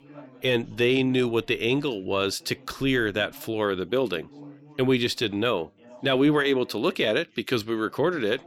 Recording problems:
background chatter; faint; throughout; 4 voices, 25 dB below the speech

